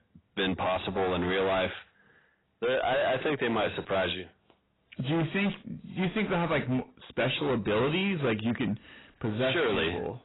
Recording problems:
distortion; heavy; 20% of the sound clipped
garbled, watery; badly; nothing above 4 kHz

